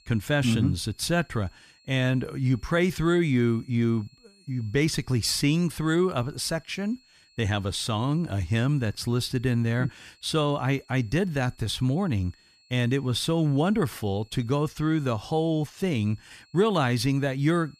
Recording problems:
high-pitched whine; faint; throughout; 4.5 kHz, 30 dB below the speech

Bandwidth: 14.5 kHz